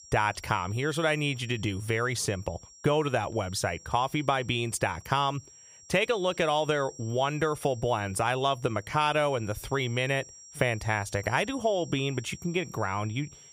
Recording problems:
high-pitched whine; noticeable; throughout; 5.5 kHz, 20 dB below the speech

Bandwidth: 15.5 kHz